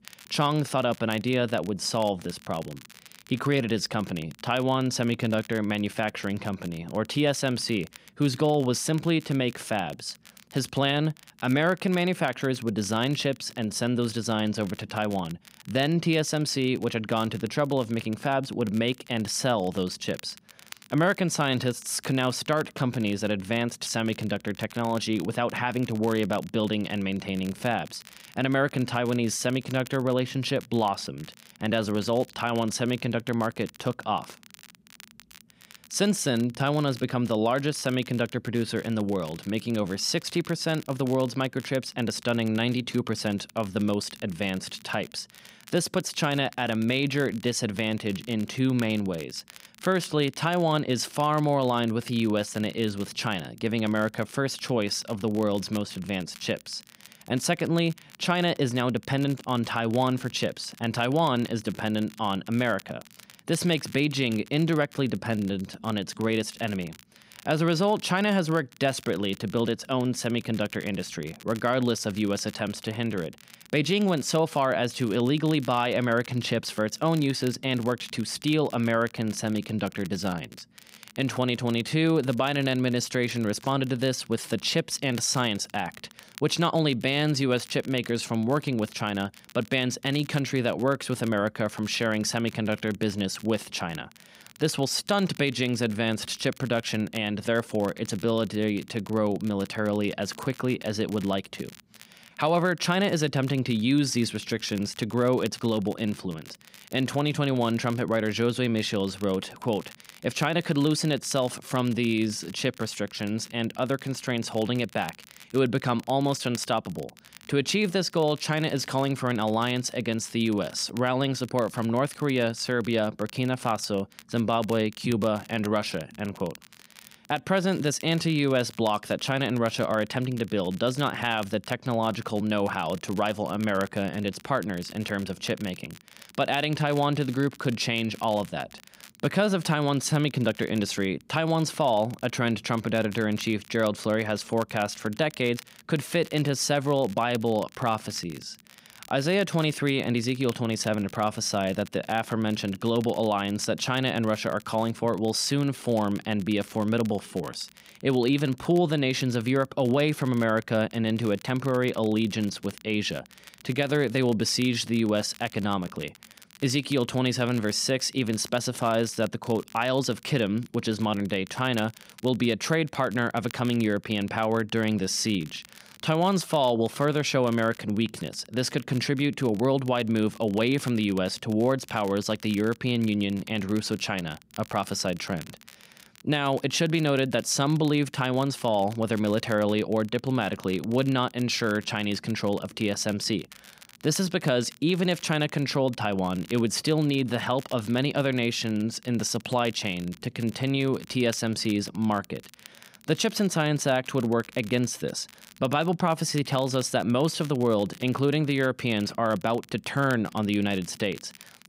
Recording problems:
crackle, like an old record; faint; 20 dB below the speech

